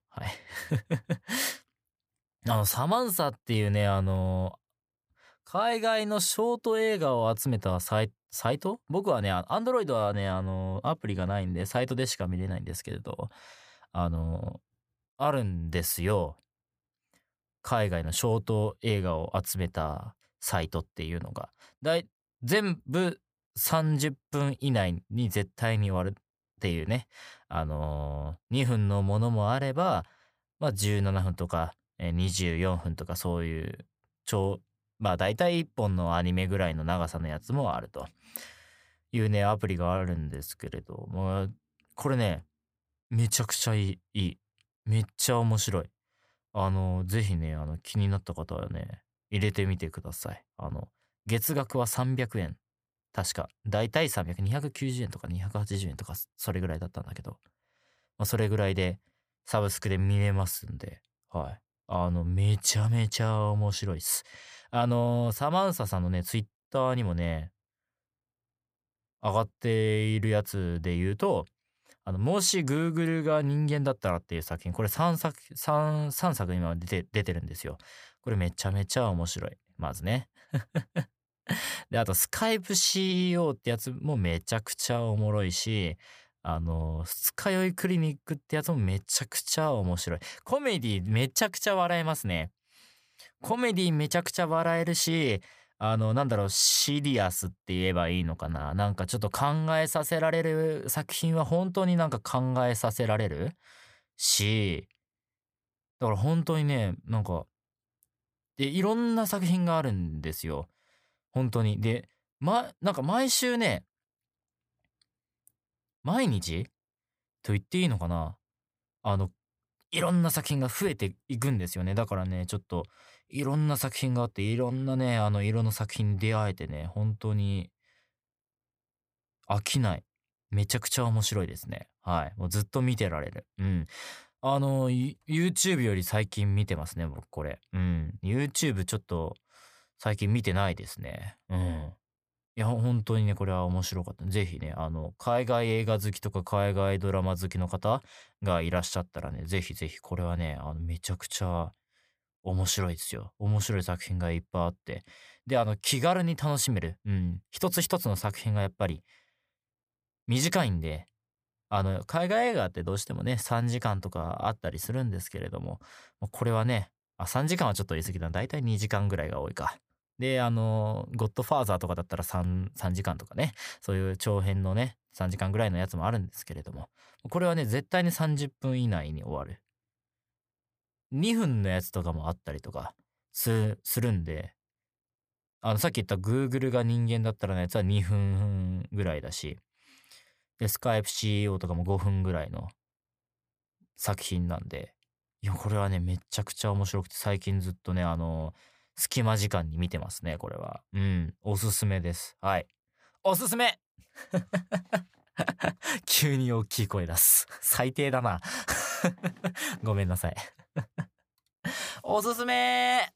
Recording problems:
none

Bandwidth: 15 kHz